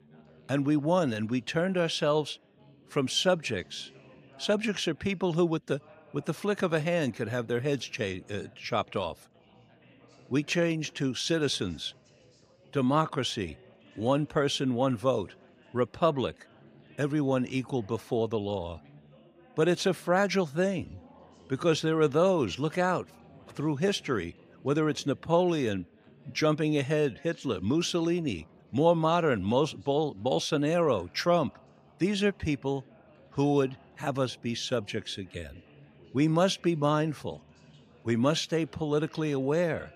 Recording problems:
background chatter; faint; throughout; 4 voices, 30 dB below the speech

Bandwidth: 15 kHz